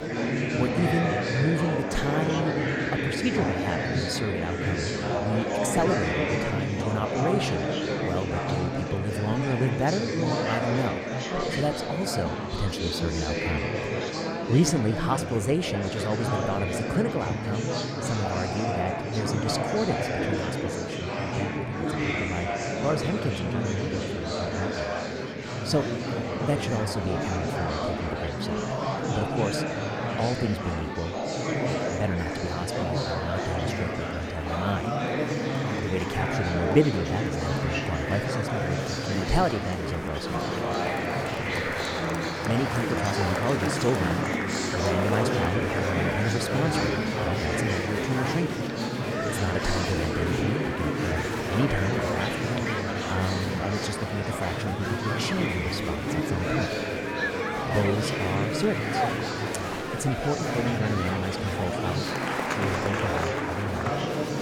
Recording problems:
murmuring crowd; very loud; throughout; 2 dB above the speech

